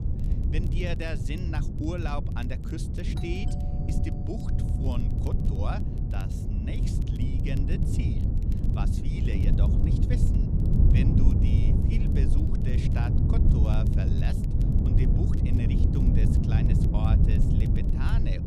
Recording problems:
wind noise on the microphone; heavy; 2 dB above the speech
crackle, like an old record; faint; 20 dB below the speech
doorbell; noticeable; from 3 to 5.5 s; peak 9 dB below the speech

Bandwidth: 14.5 kHz